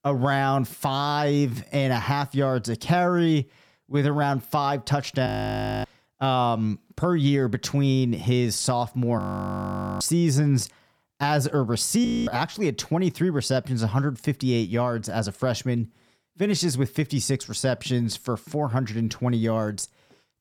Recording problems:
audio freezing; at 5.5 s for 0.5 s, at 9 s for 1 s and at 12 s

